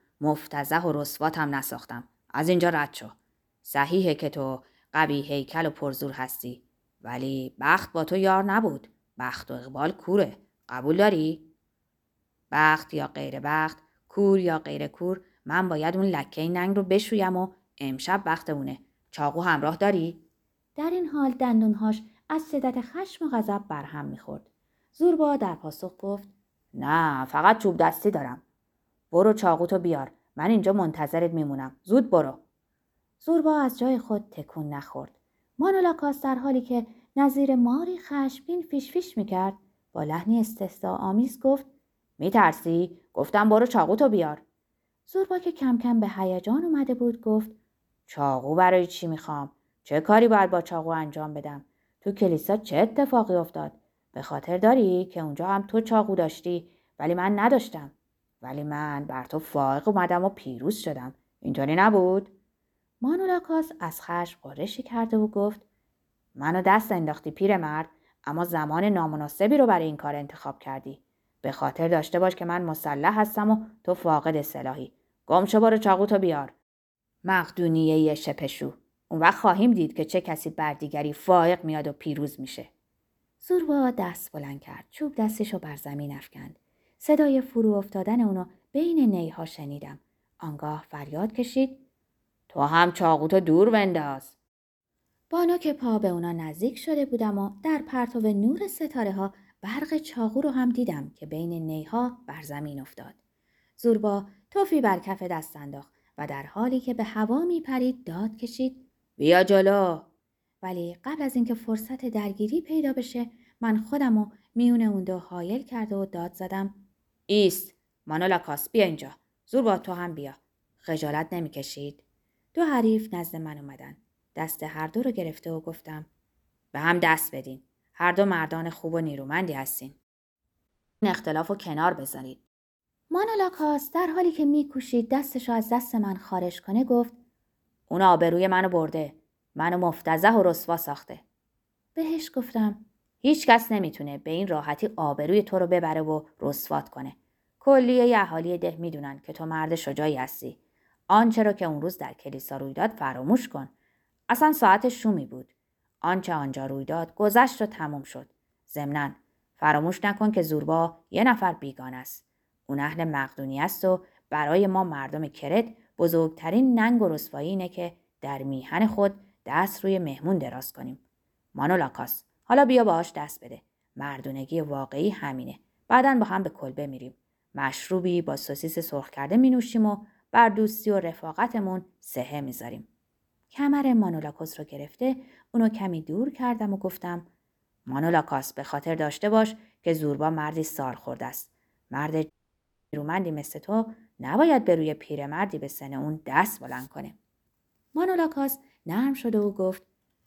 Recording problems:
audio cutting out; at 2:11 and at 3:12 for 0.5 s

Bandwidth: 18.5 kHz